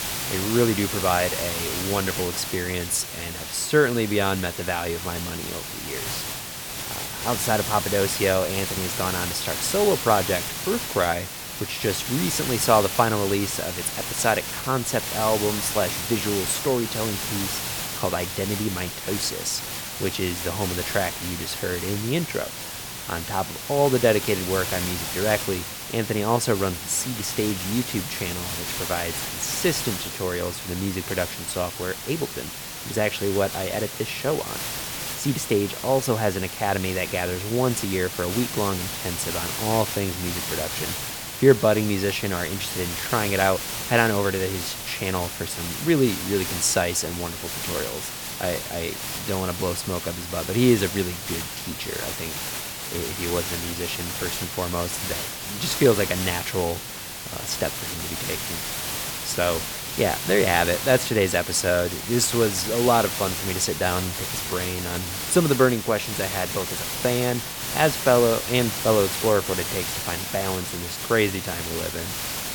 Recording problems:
hiss; loud; throughout; 4 dB below the speech

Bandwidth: 18.5 kHz